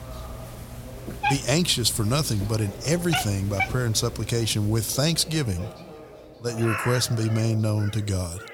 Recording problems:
echo of what is said; faint; throughout; 580 ms later, 25 dB below the speech
animal sounds; loud; throughout; 8 dB below the speech
background chatter; faint; throughout; 2 voices, 20 dB below the speech

